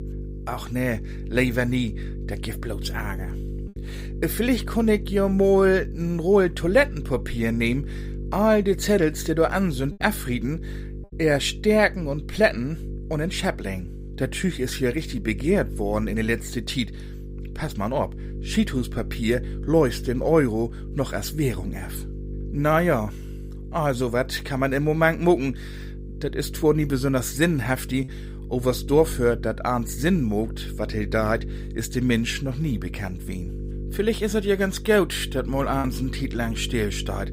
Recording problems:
electrical hum; noticeable; throughout; 50 Hz, 20 dB below the speech
choppy; occasionally; under 1% of the speech affected

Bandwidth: 15.5 kHz